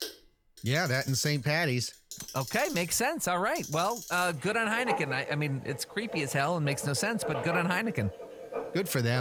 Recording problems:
household noises; noticeable; throughout; 10 dB below the speech
abrupt cut into speech; at the end

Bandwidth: 18.5 kHz